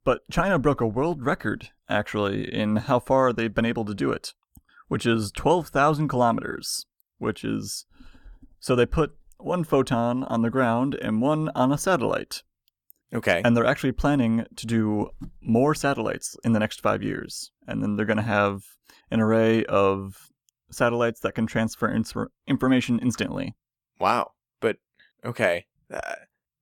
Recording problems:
none

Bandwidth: 17.5 kHz